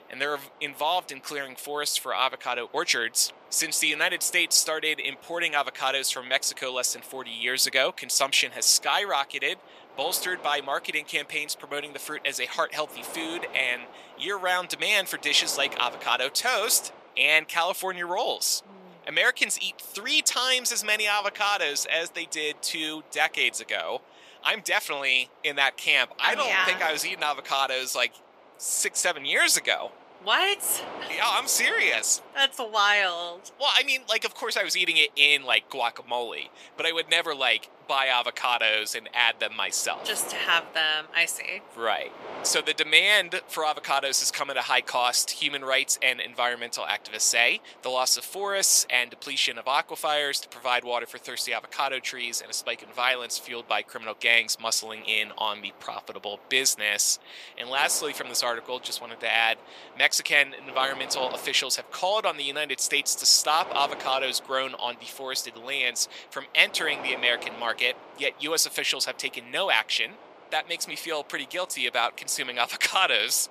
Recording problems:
thin; very; fading below 700 Hz
wind noise on the microphone; occasional gusts; 20 dB below the speech

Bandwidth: 14.5 kHz